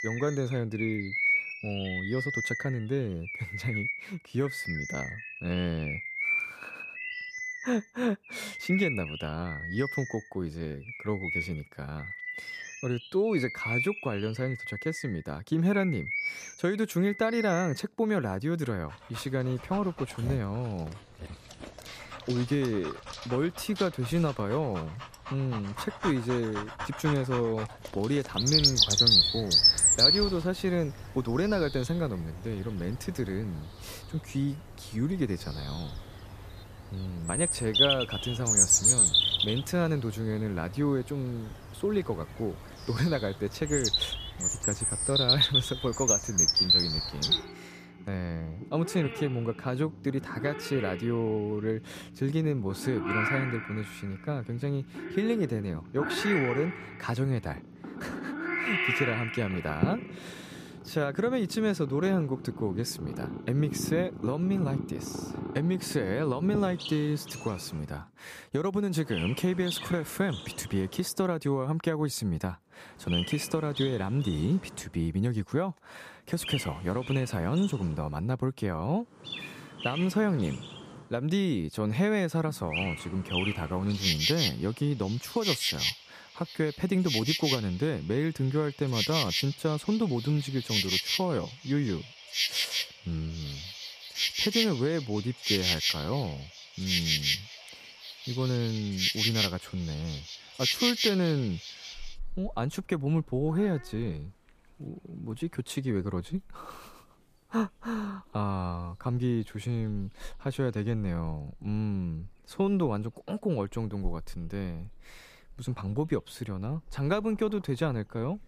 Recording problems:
animal sounds; very loud; throughout; 3 dB above the speech

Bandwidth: 14.5 kHz